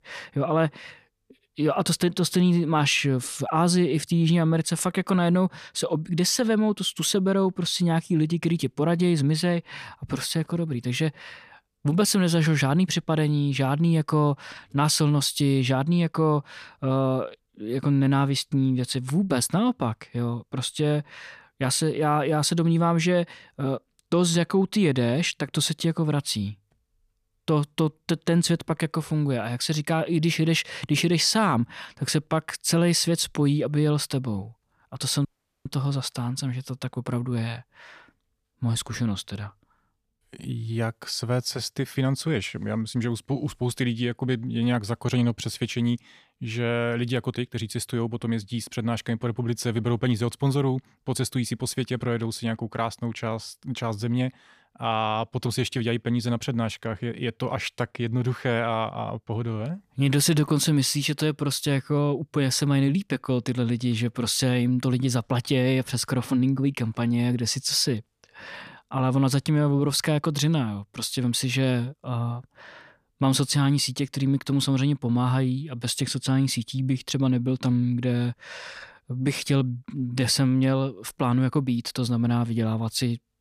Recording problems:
audio cutting out; at 35 s

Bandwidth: 14.5 kHz